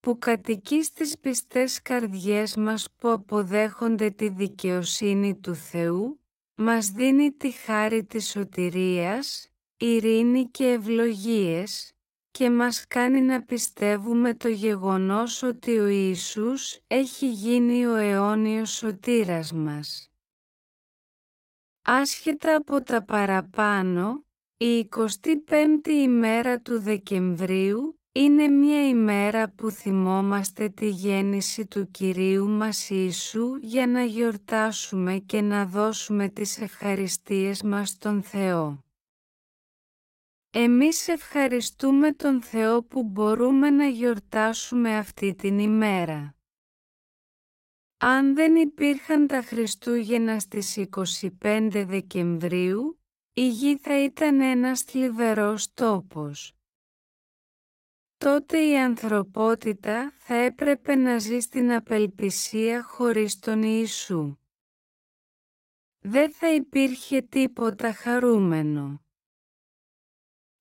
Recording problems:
wrong speed, natural pitch; too slow; 0.6 times normal speed

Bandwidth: 16 kHz